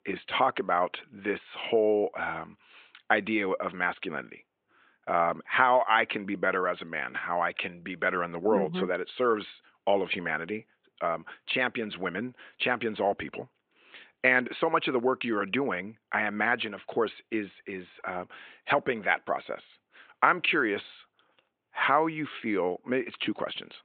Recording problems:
high frequencies cut off; severe; nothing above 4 kHz
thin; somewhat; fading below 300 Hz

